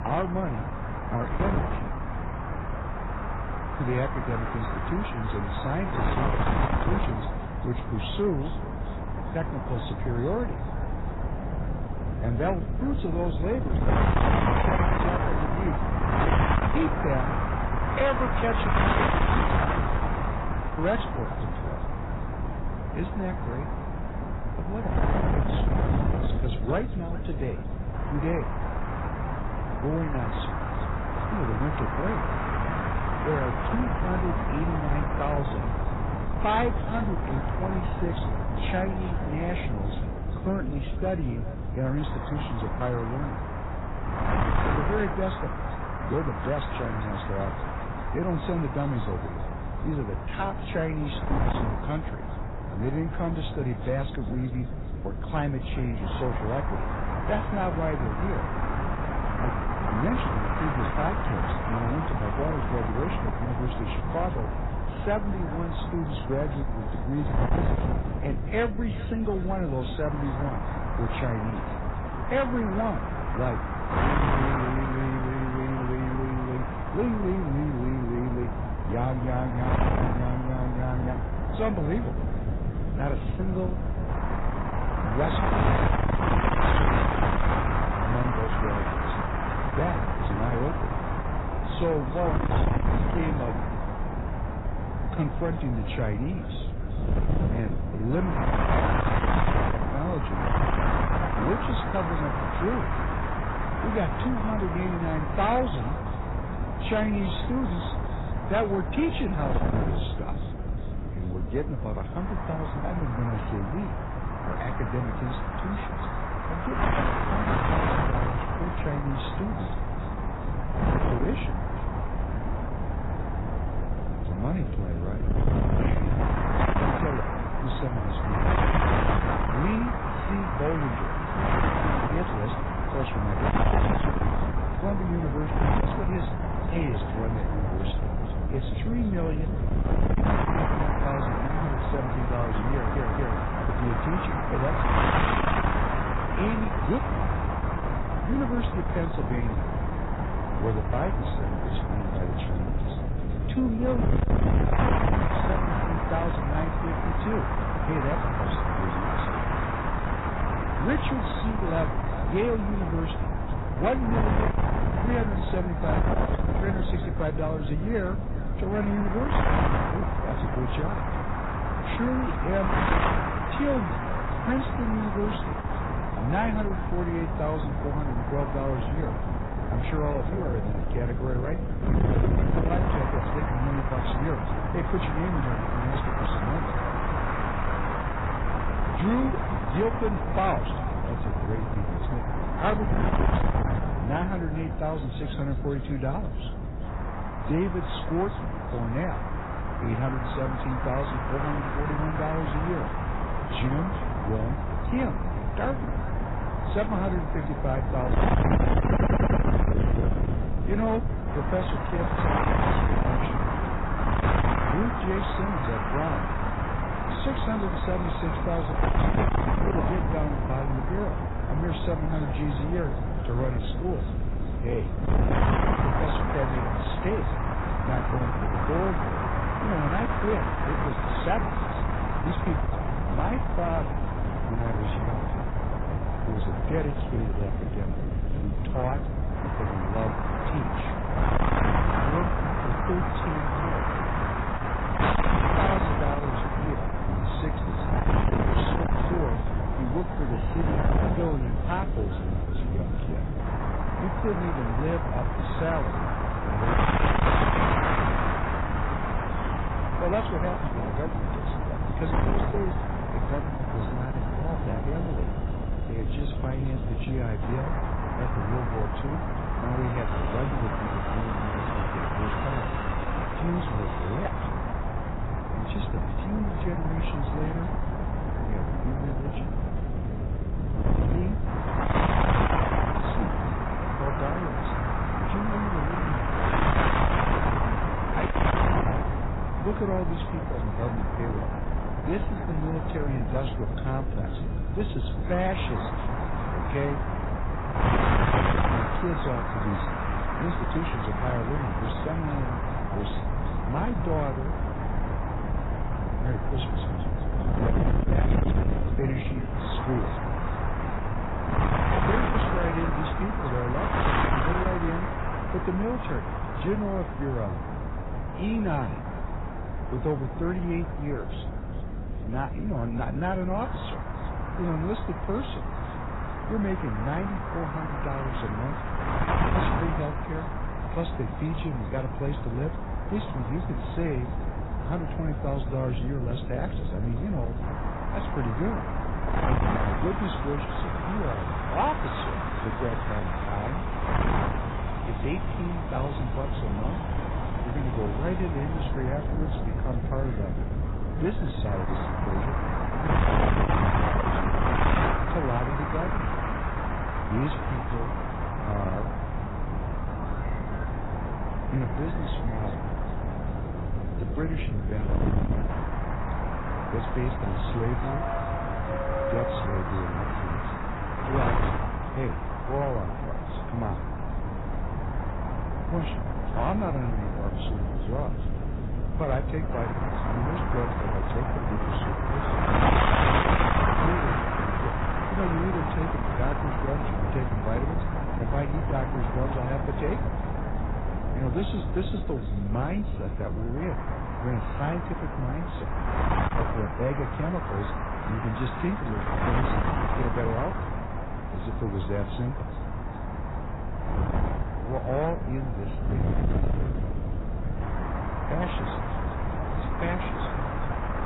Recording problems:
distortion; heavy; 7 dB below the speech
garbled, watery; badly; nothing above 4 kHz
echo of what is said; faint; throughout; 400 ms later, 25 dB below the speech
wind noise on the microphone; heavy; 2 dB above the speech
train or aircraft noise; noticeable; throughout; 15 dB below the speech
audio stuttering; at 2:23 and at 3:29

